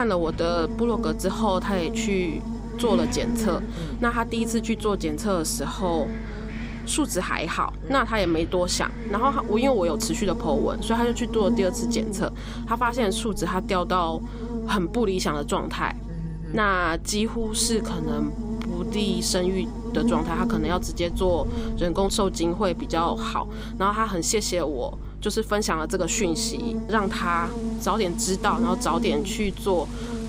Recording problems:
electrical hum; noticeable; throughout; 50 Hz, 10 dB below the speech
wind in the background; noticeable; throughout; 20 dB below the speech
abrupt cut into speech; at the start

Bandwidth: 15.5 kHz